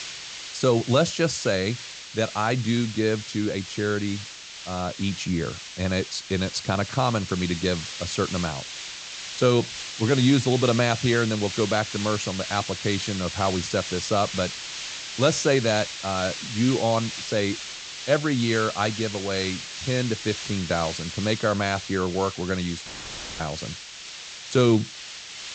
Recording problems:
high frequencies cut off; noticeable; nothing above 8 kHz
hiss; loud; throughout; 9 dB below the speech
audio cutting out; filled with static; at 23 s for 0.5 s

